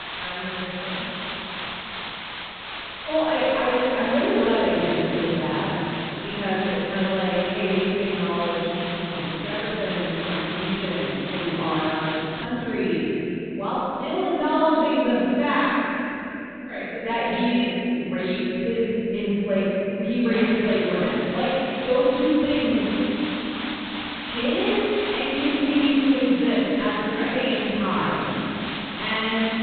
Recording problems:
room echo; strong; dies away in 3 s
off-mic speech; far
high frequencies cut off; severe; nothing above 4 kHz
hiss; loud; until 12 s and from 20 s on; 8 dB below the speech

